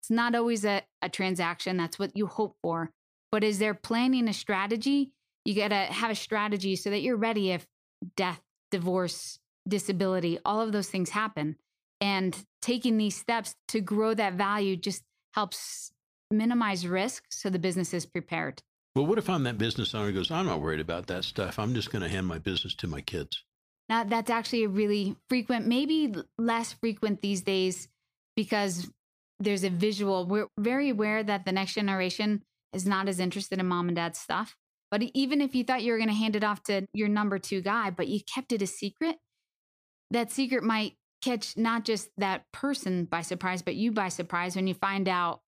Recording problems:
none

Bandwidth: 15 kHz